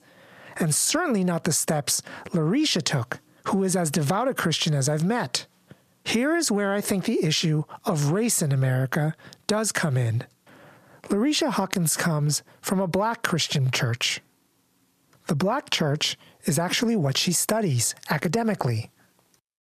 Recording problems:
squashed, flat; heavily

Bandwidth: 14.5 kHz